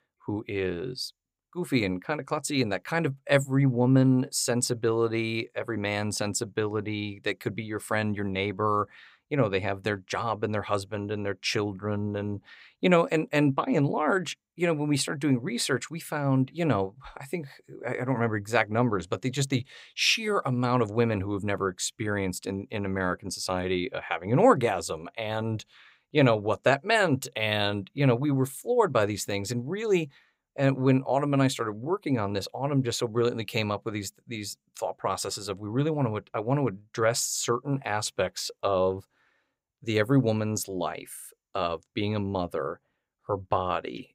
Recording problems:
none

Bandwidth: 15.5 kHz